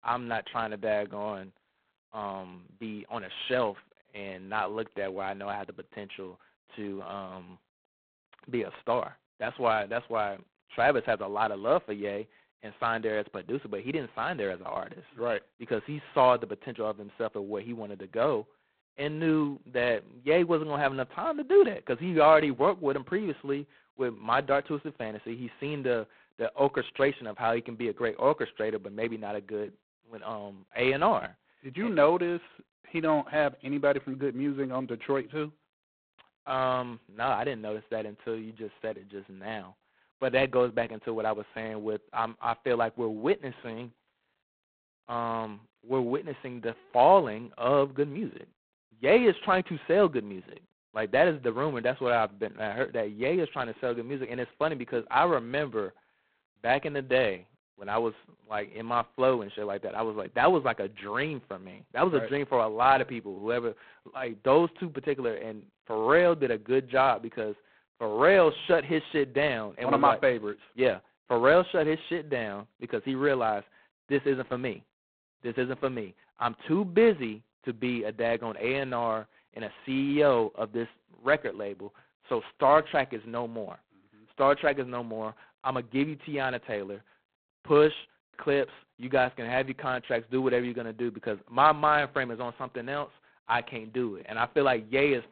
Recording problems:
phone-call audio; poor line; nothing above 4 kHz

